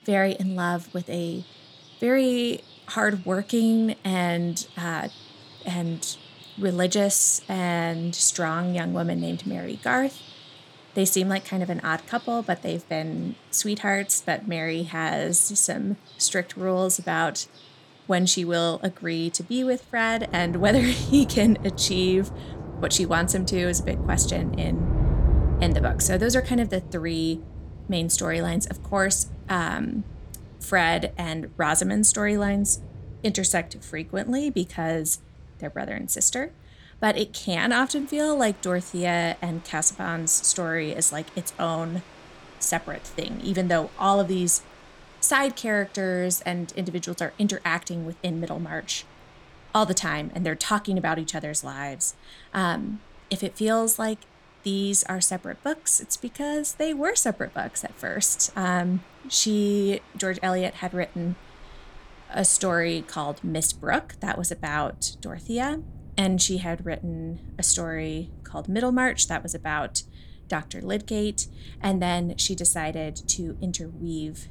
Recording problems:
rain or running water; noticeable; throughout; 10 dB below the speech

